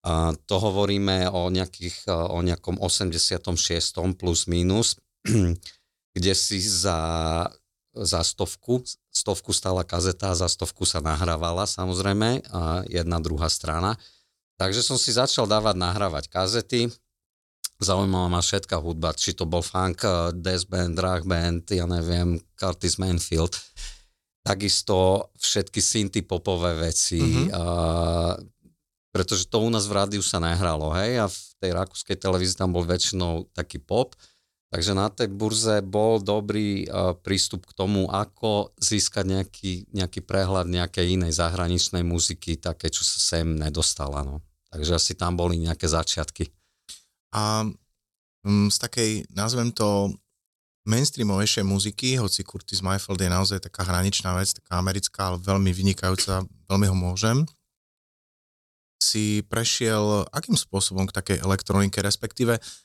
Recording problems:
none

